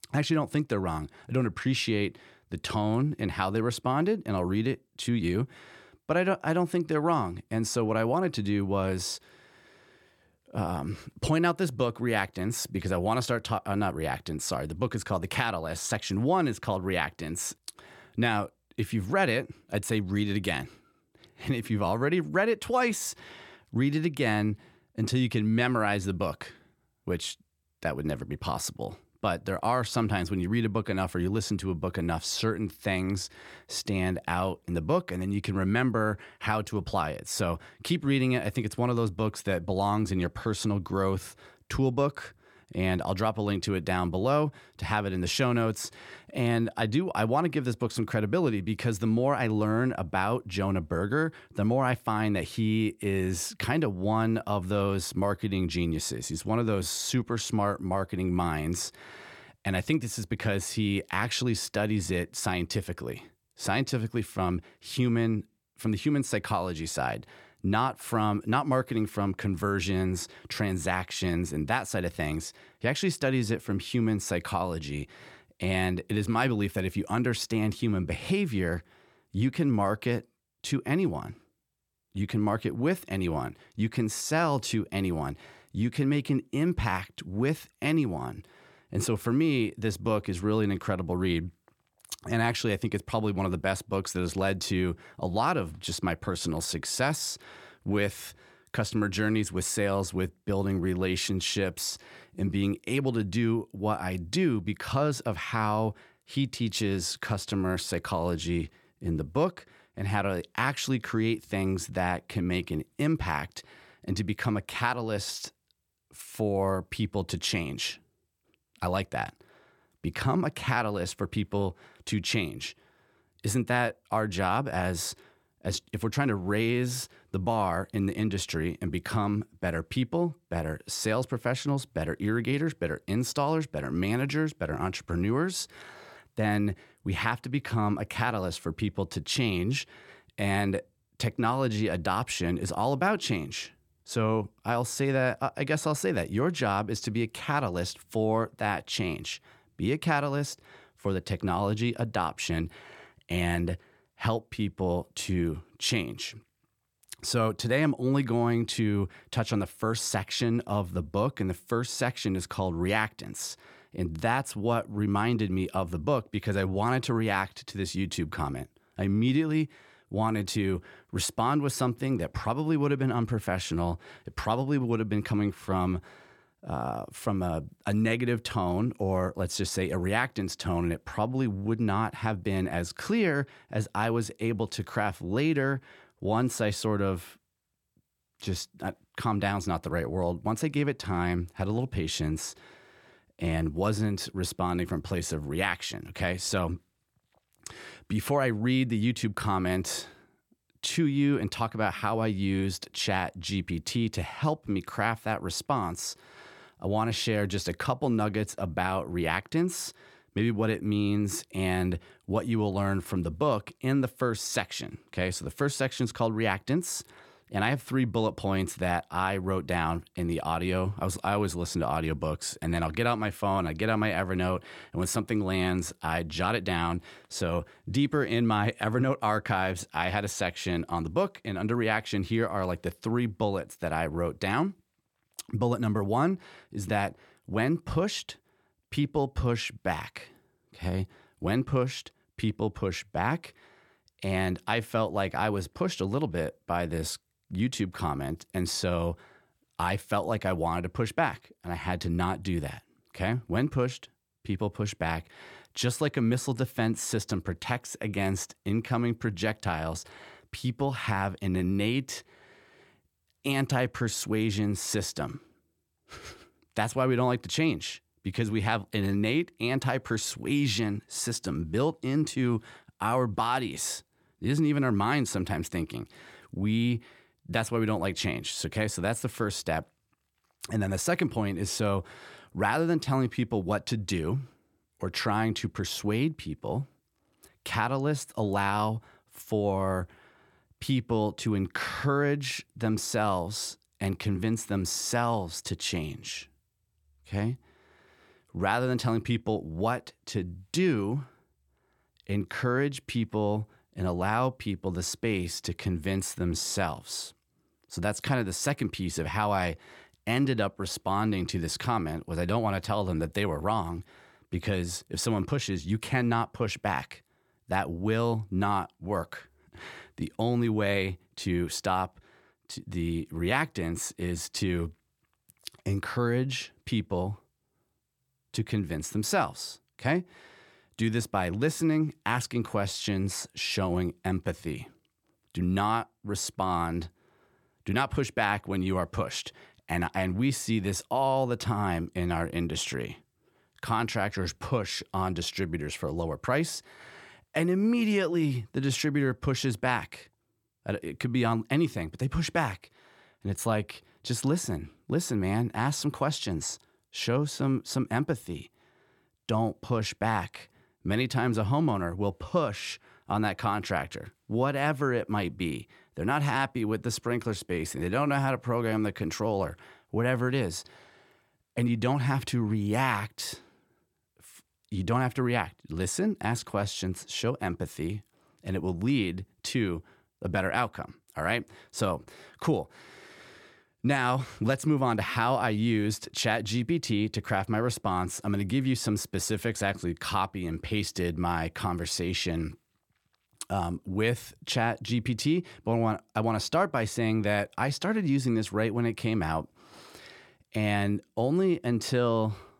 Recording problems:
none

